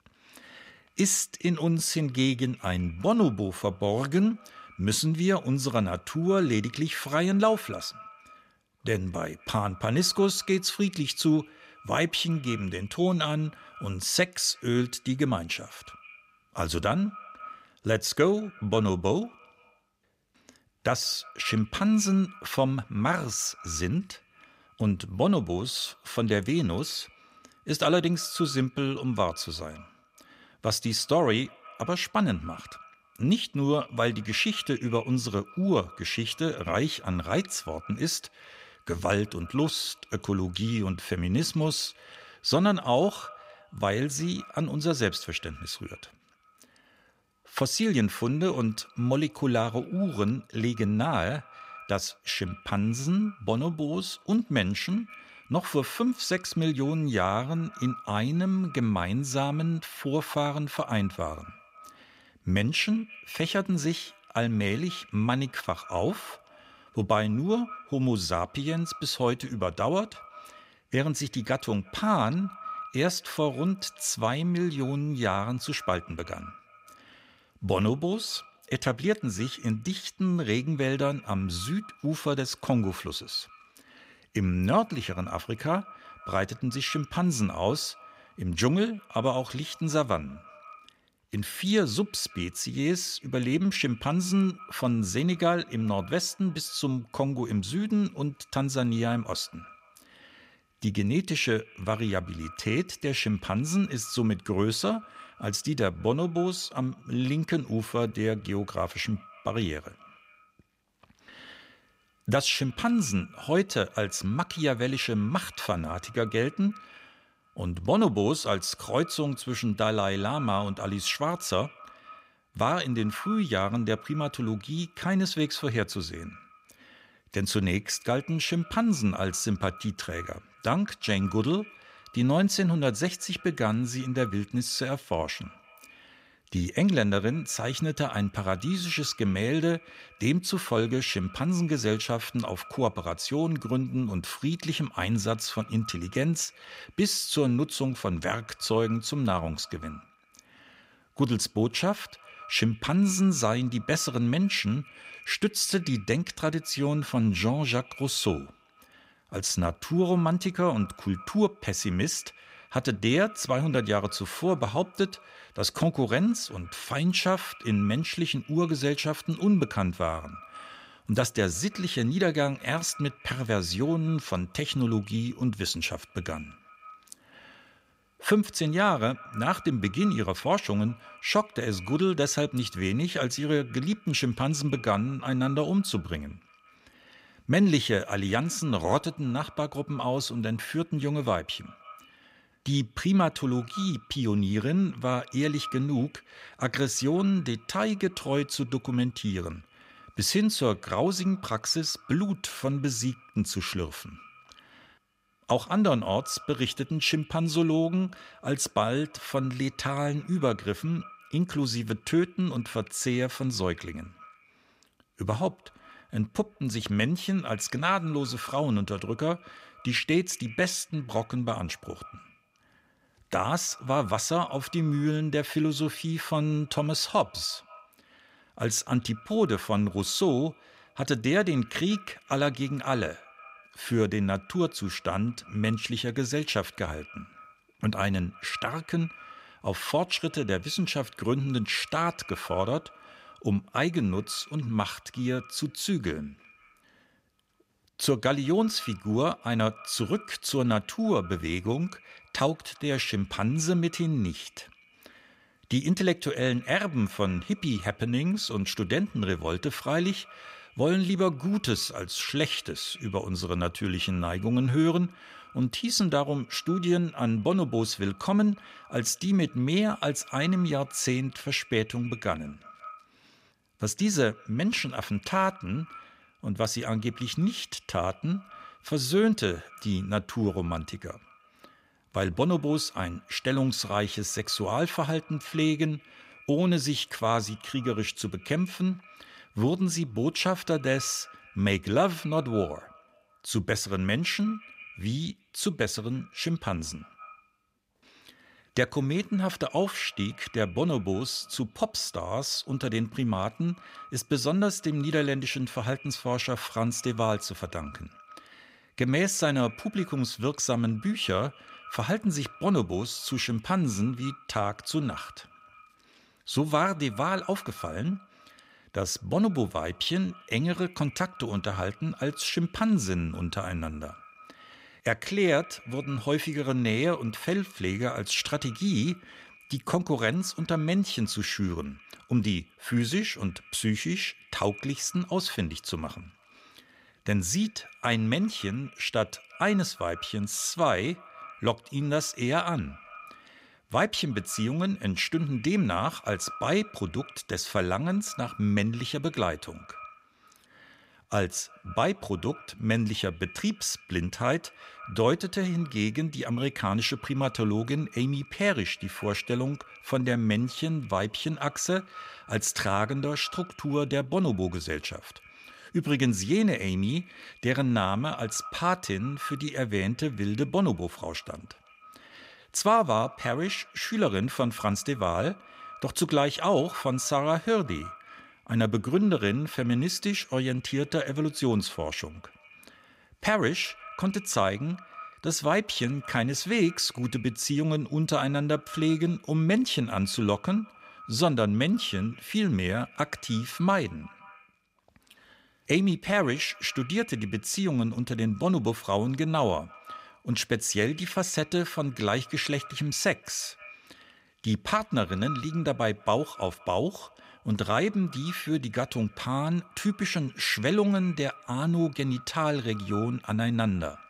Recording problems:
echo of what is said; faint; throughout; 170 ms later, 20 dB below the speech

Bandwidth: 15.5 kHz